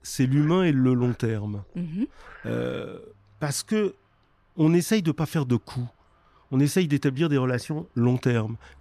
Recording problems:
animal sounds; faint; throughout; 25 dB below the speech

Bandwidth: 14.5 kHz